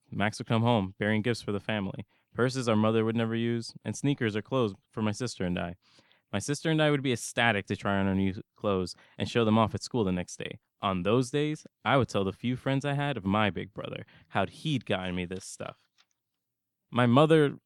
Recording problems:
none

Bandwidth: 18 kHz